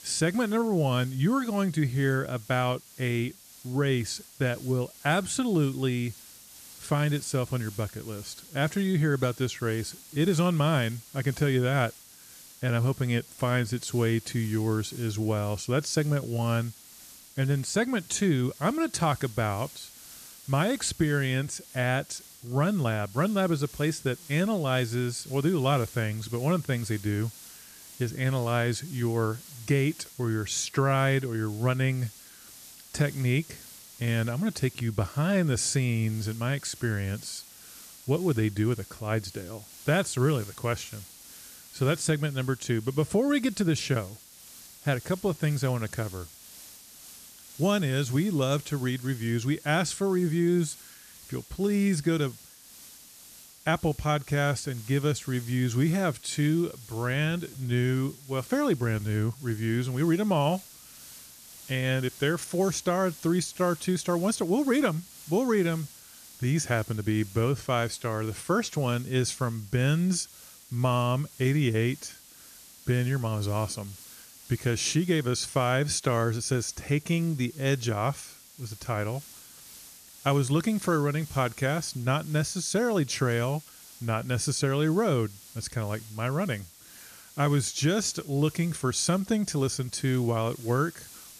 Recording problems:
hiss; noticeable; throughout; 20 dB below the speech

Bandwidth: 14.5 kHz